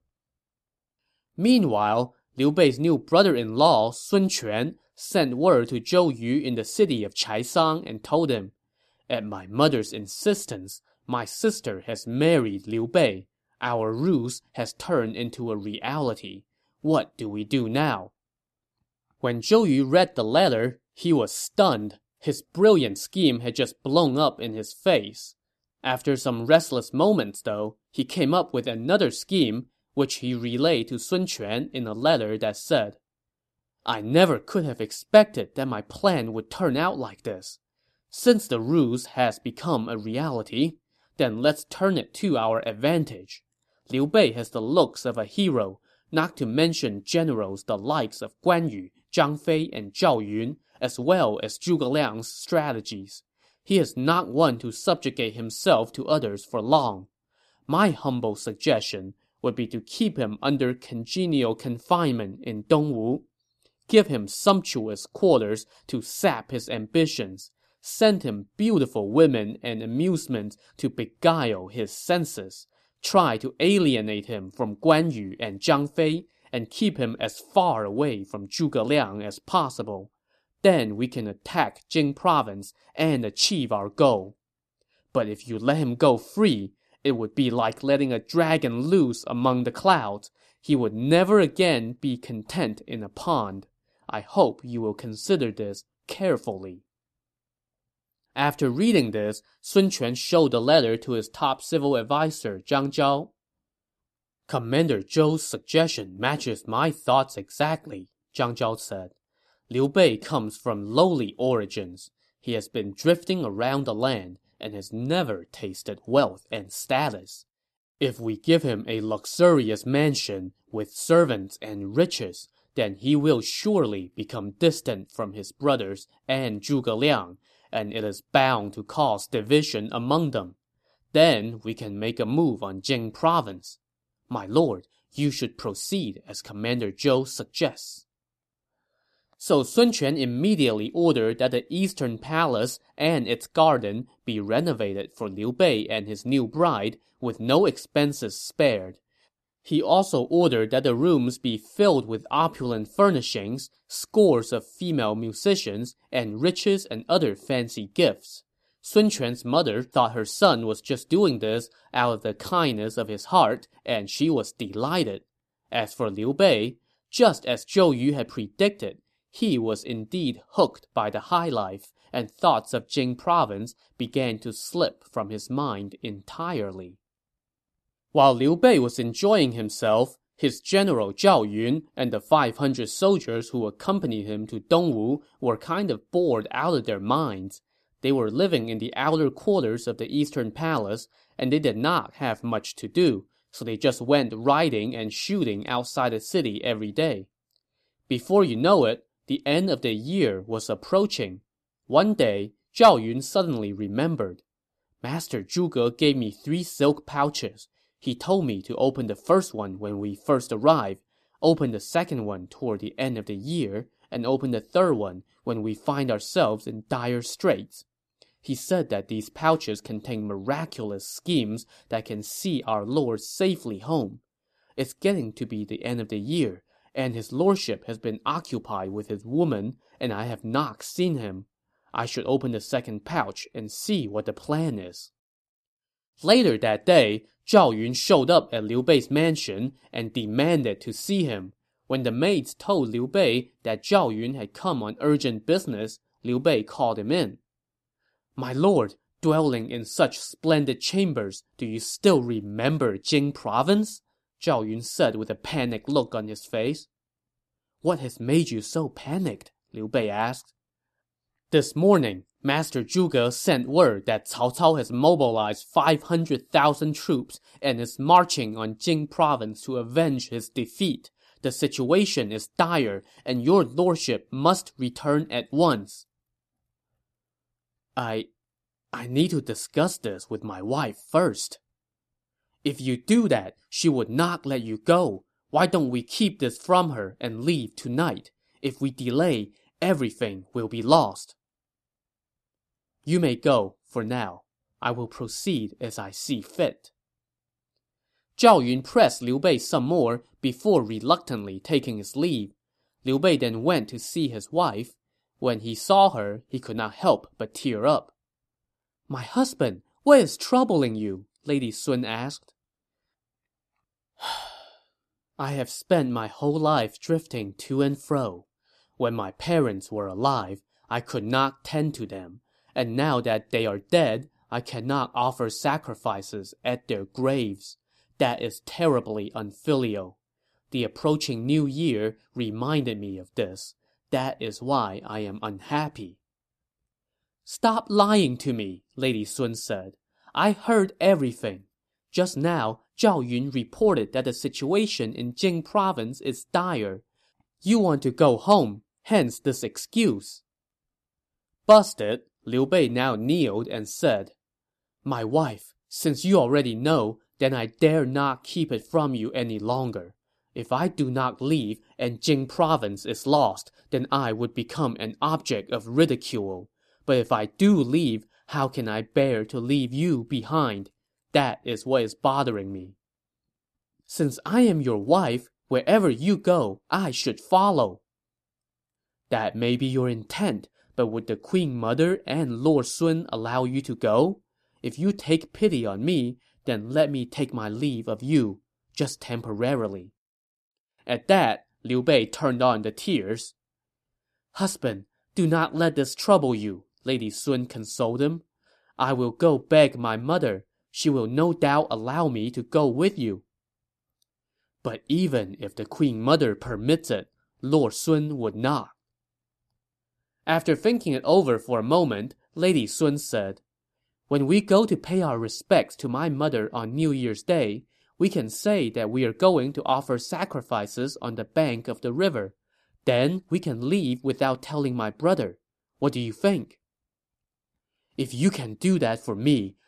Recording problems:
none

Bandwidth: 13.5 kHz